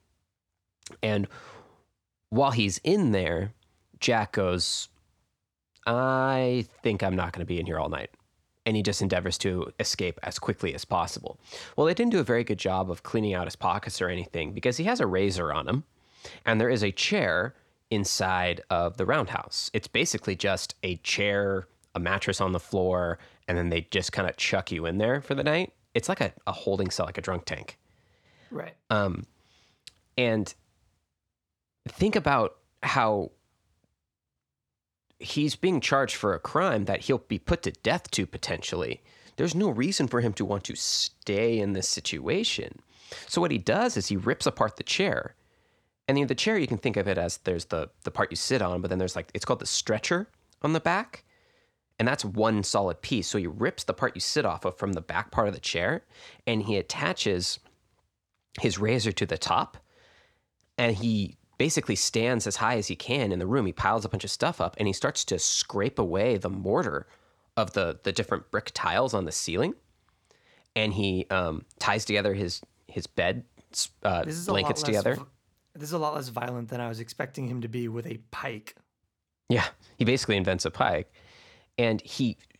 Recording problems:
none

